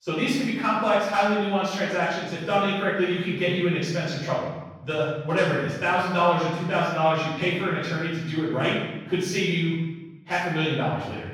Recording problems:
room echo; strong; dies away in 1.1 s
off-mic speech; far

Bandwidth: 17 kHz